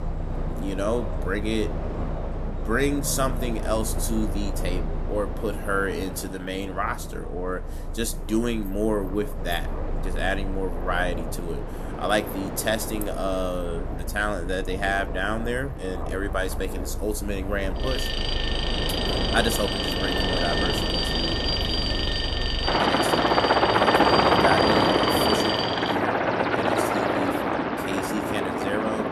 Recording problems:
train or aircraft noise; very loud; throughout; 2 dB above the speech
traffic noise; very faint; throughout; 25 dB below the speech
alarm; loud; from 18 to 26 s; peak 4 dB above the speech

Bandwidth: 13.5 kHz